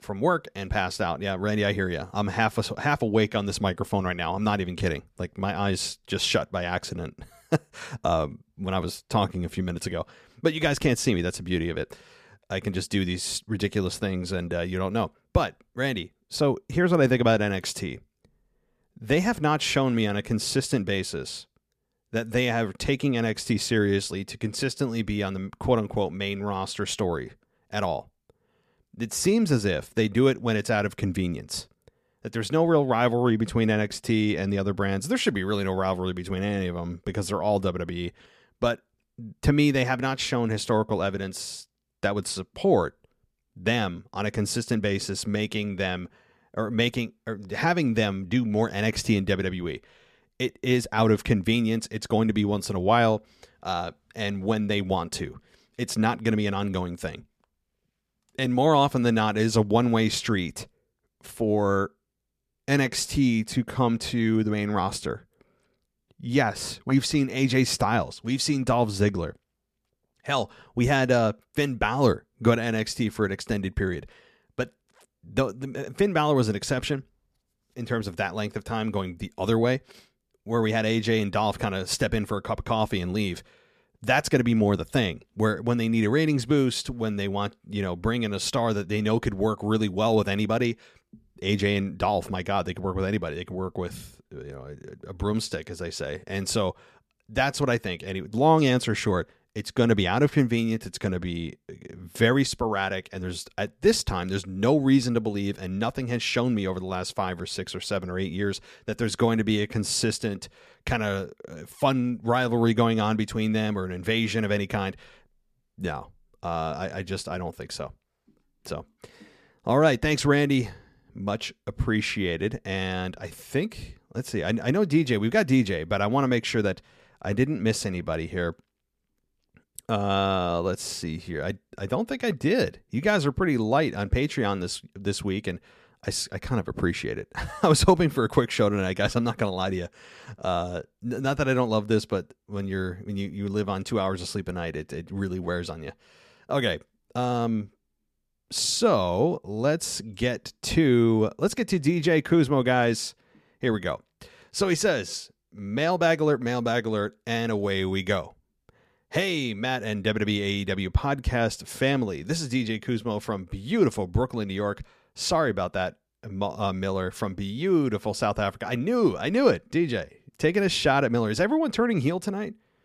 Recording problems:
none

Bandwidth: 14.5 kHz